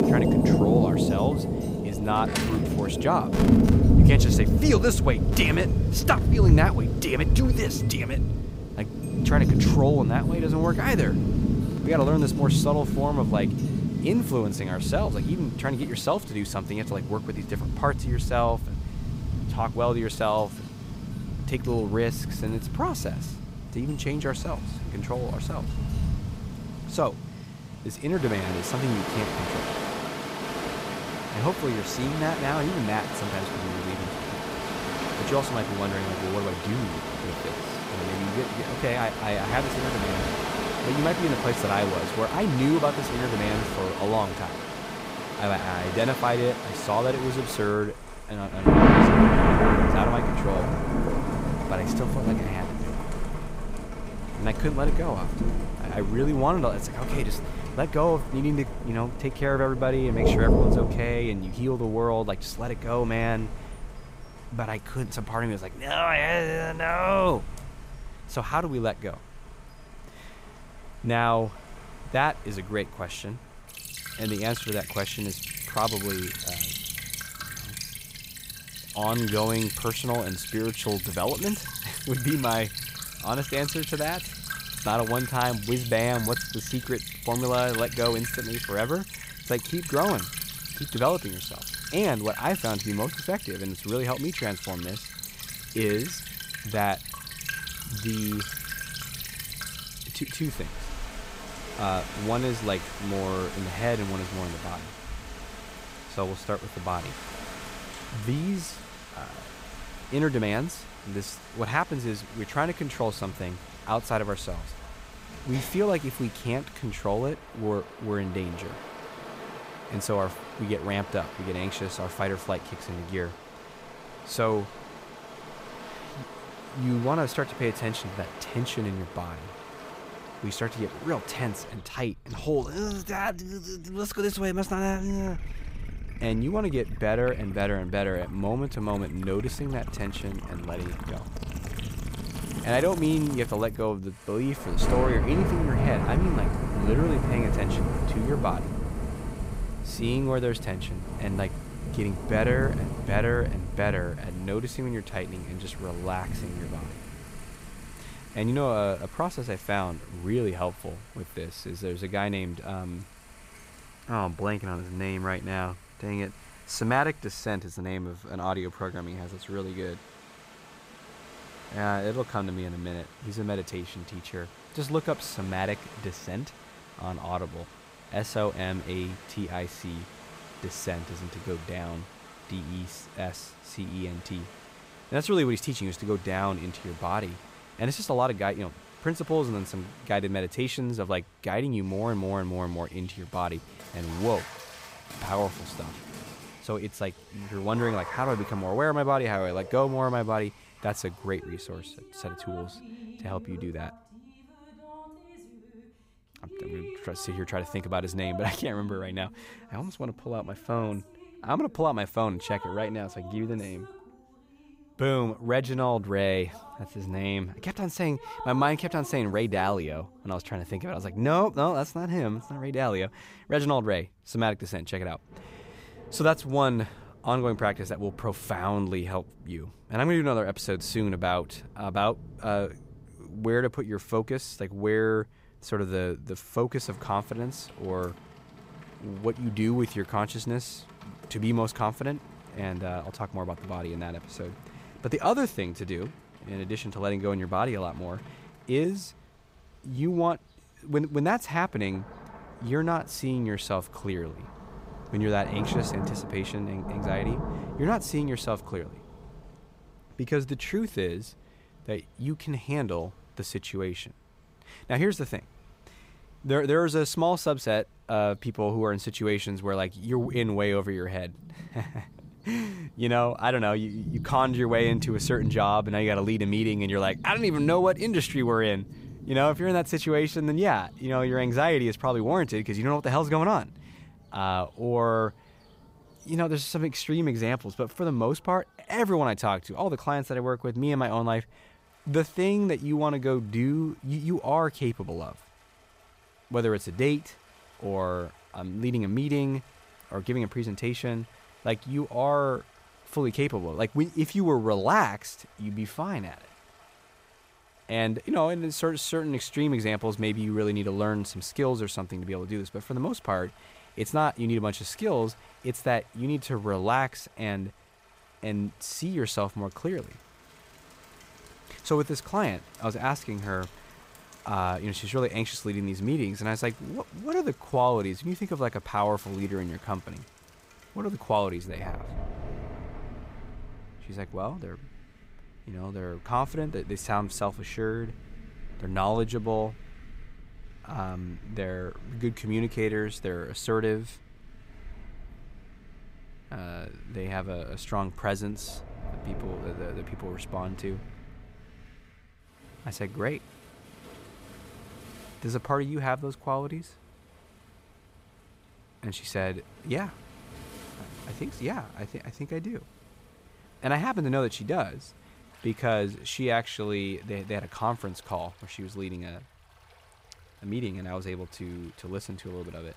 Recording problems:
rain or running water; loud; throughout; 1 dB below the speech

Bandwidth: 15.5 kHz